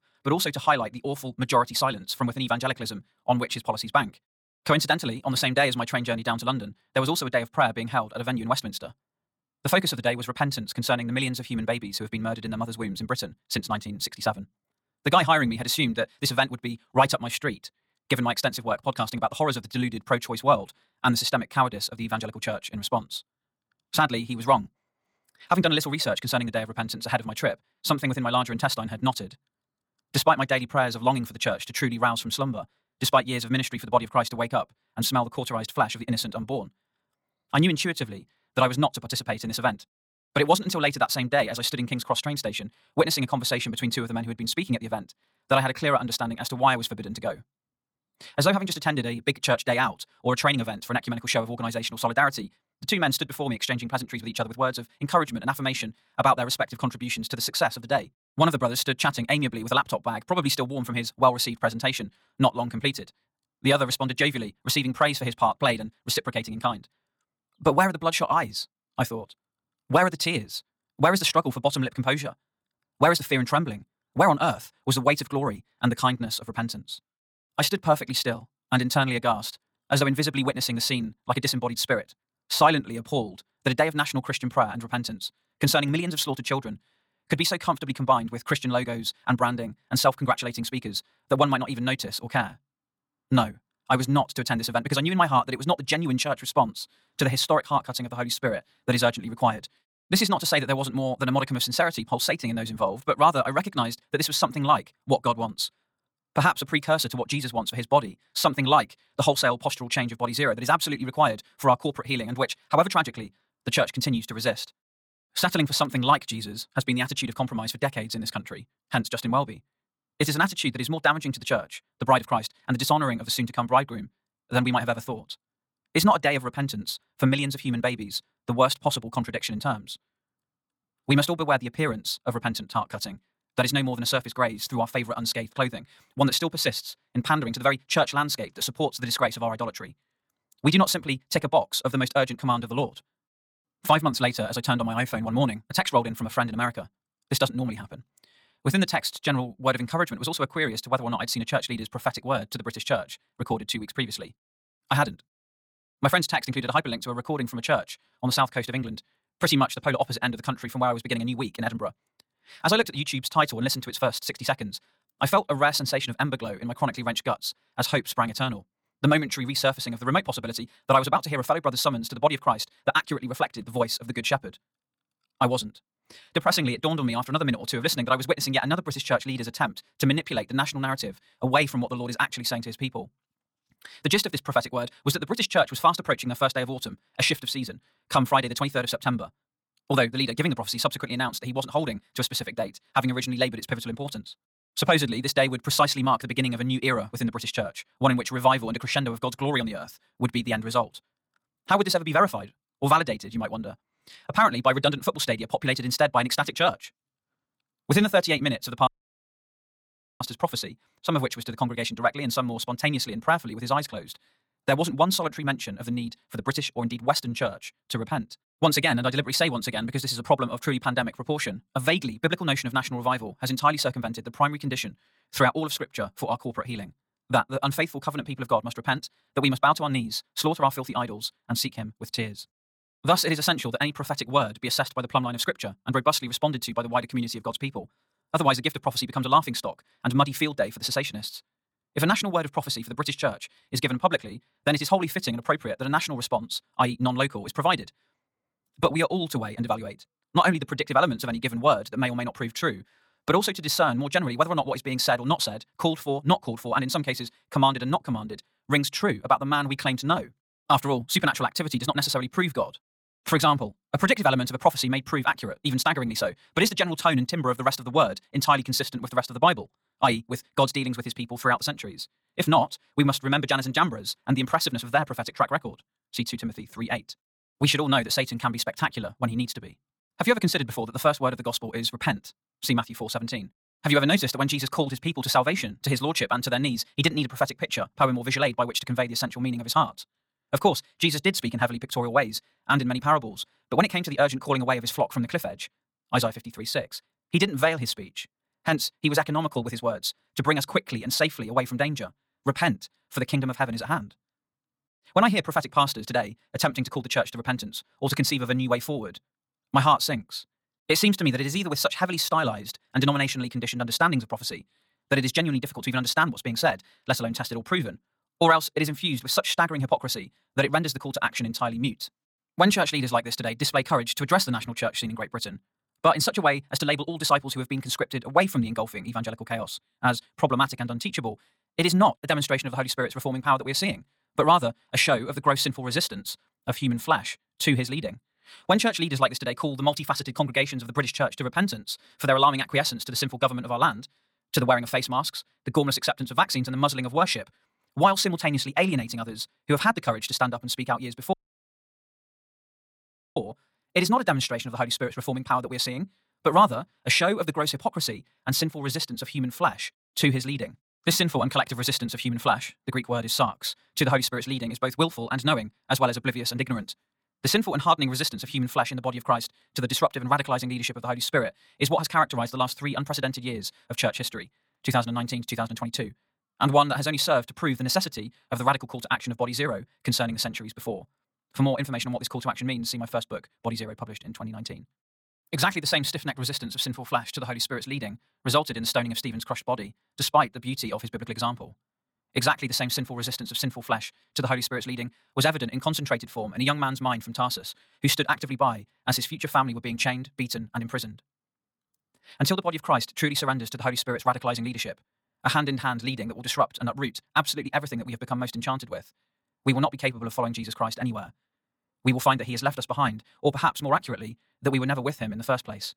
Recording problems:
wrong speed, natural pitch; too fast; 1.8 times normal speed
audio cutting out; at 3:29 for 1.5 s and at 5:51 for 2 s

